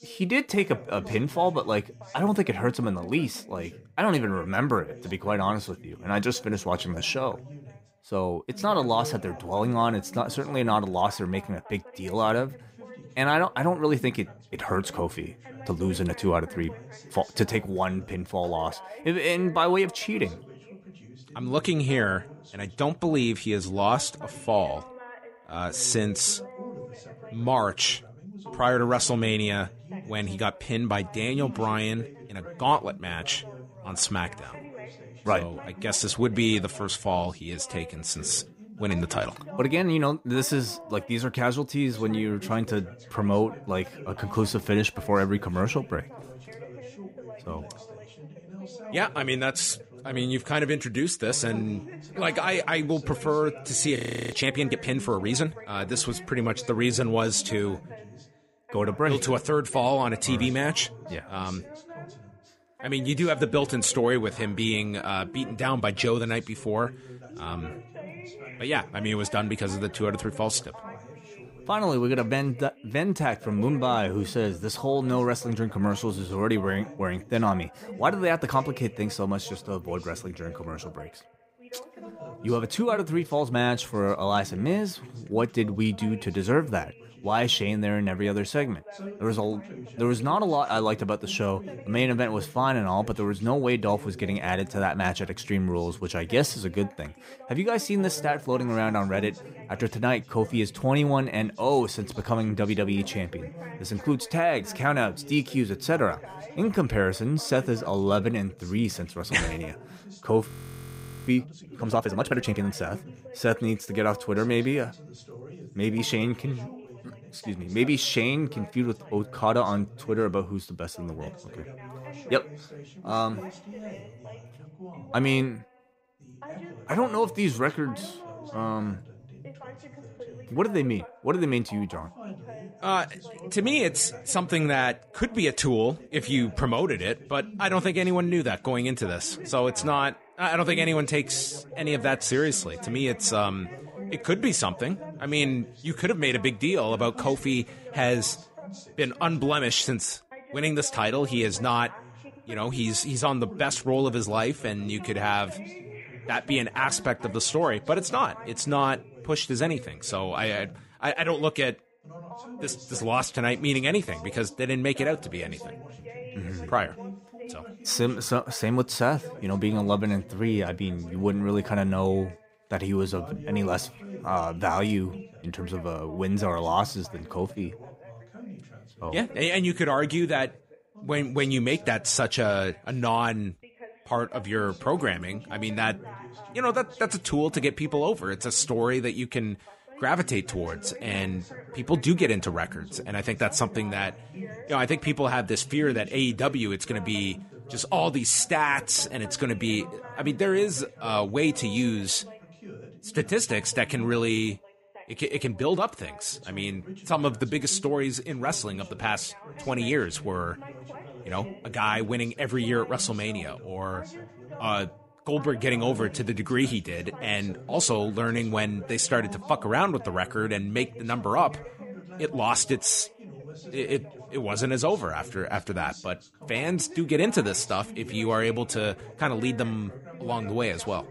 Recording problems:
background chatter; noticeable; throughout; 2 voices, 15 dB below the speech
audio freezing; at 54 s and at 1:50 for 1 s

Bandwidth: 15.5 kHz